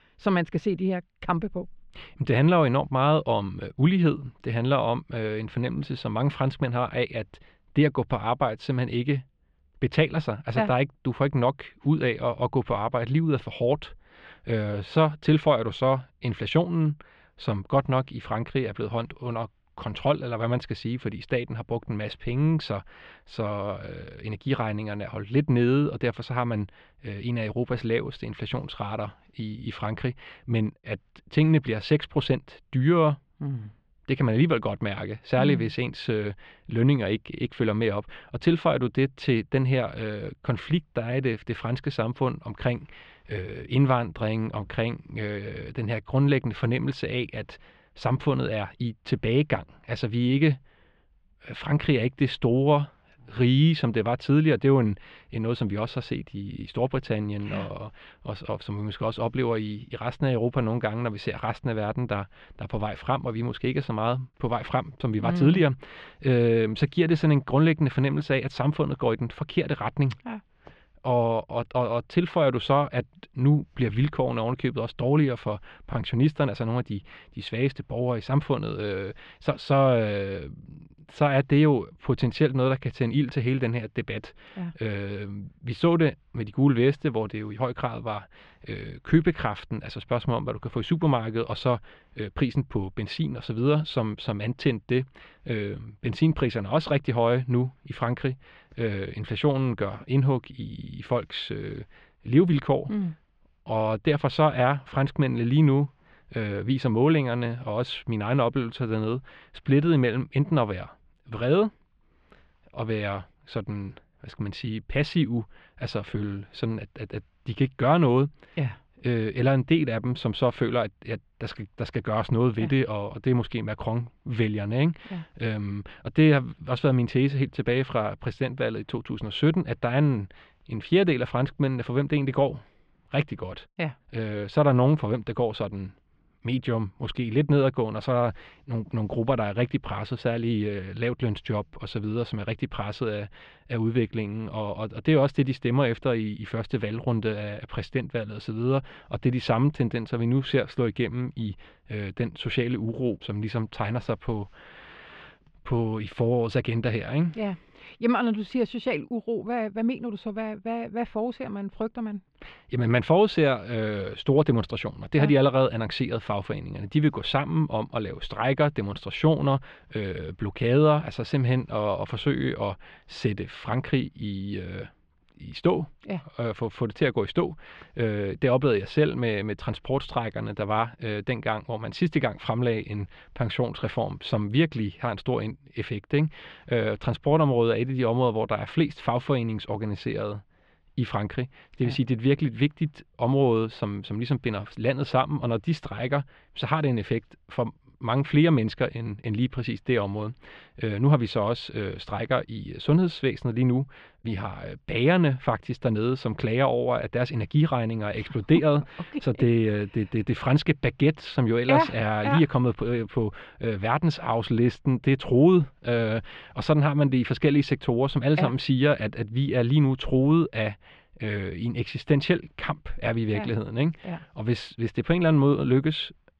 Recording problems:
muffled; slightly; fading above 3 kHz

